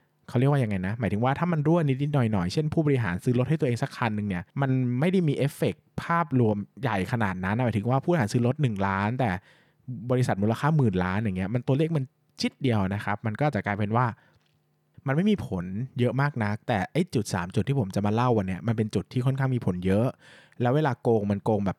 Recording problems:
none

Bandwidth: 18.5 kHz